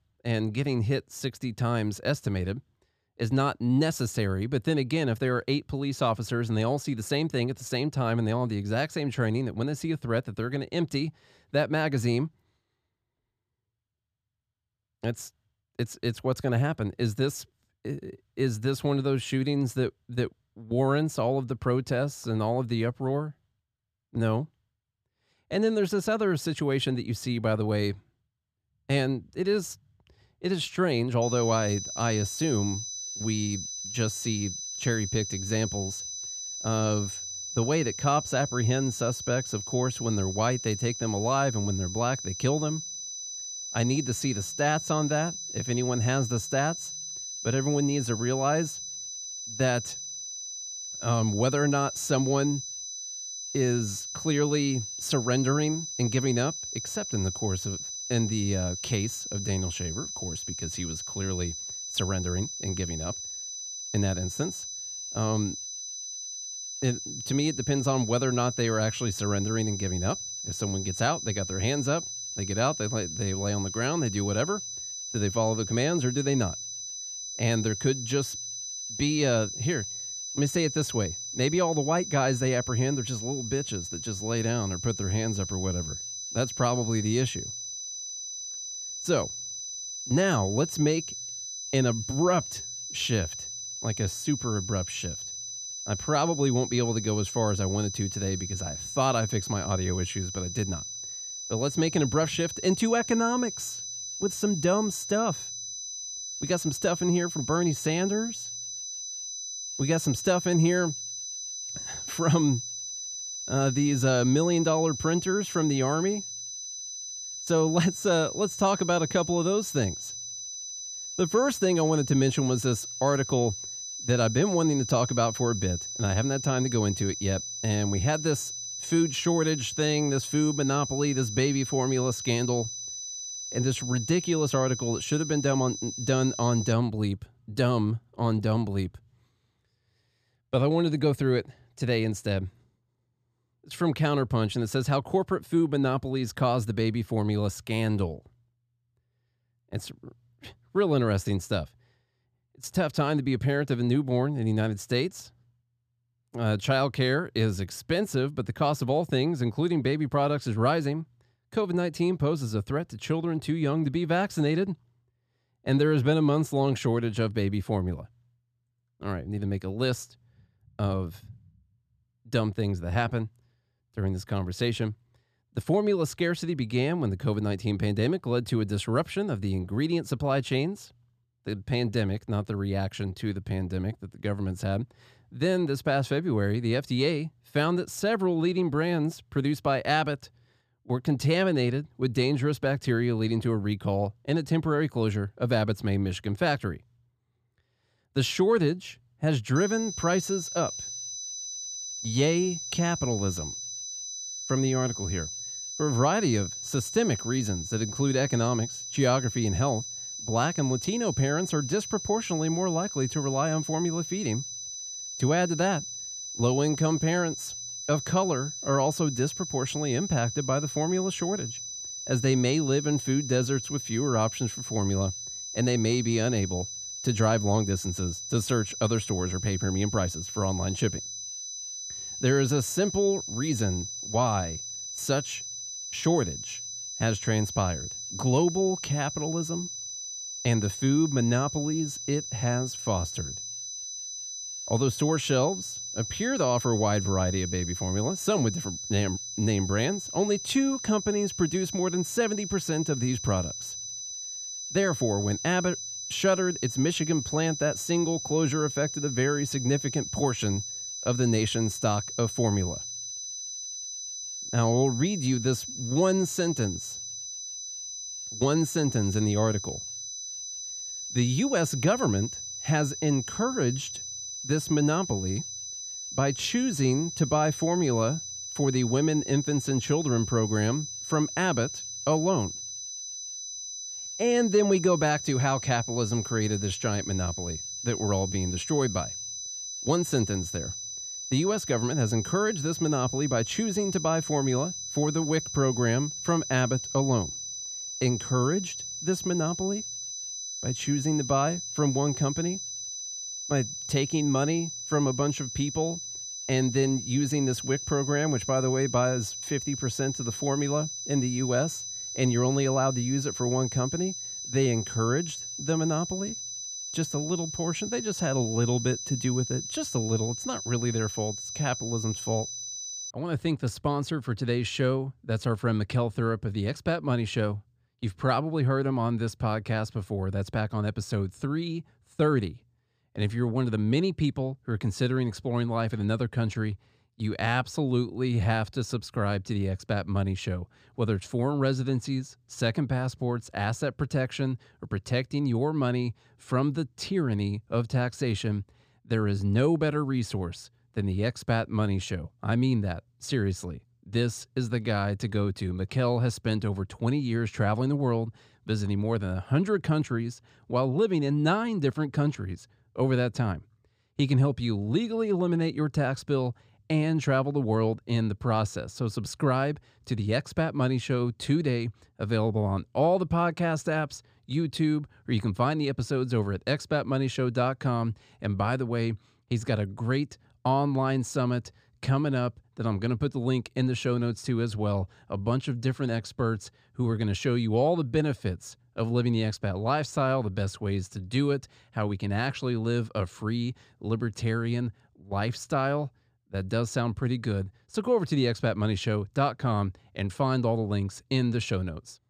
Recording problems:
high-pitched whine; loud; from 31 s to 2:17 and from 3:20 to 5:23; 6 kHz, 6 dB below the speech

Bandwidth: 14.5 kHz